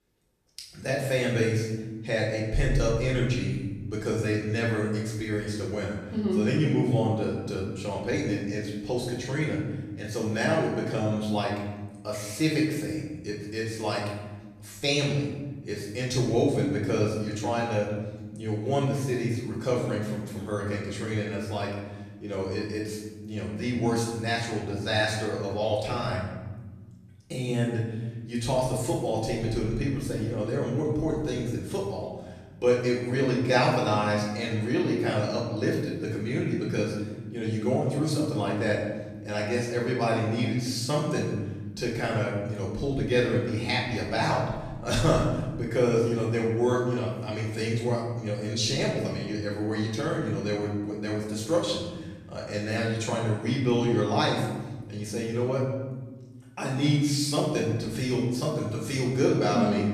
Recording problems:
off-mic speech; far
room echo; noticeable; dies away in 1.3 s

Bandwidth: 14.5 kHz